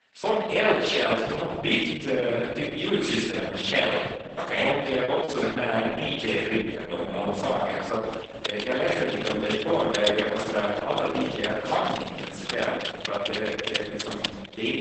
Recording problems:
off-mic speech; far
garbled, watery; badly; nothing above 8 kHz
room echo; noticeable; dies away in 1.6 s
thin; very slightly; fading below 800 Hz
choppy; very; at 5 s; 8% of the speech affected
keyboard typing; noticeable; from 8 s on; peak 1 dB below the speech

